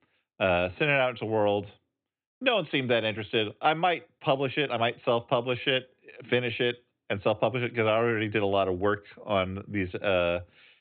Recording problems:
high frequencies cut off; severe; nothing above 4 kHz

